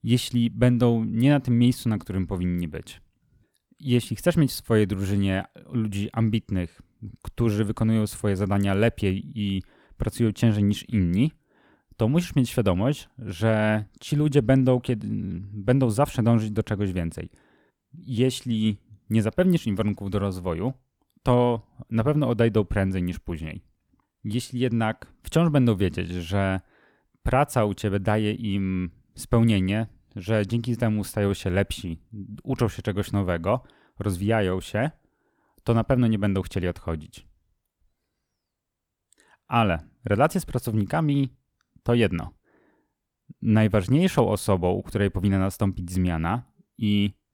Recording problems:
none

